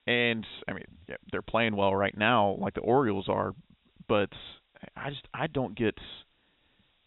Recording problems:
high frequencies cut off; severe; nothing above 4 kHz
hiss; very faint; throughout; 40 dB below the speech

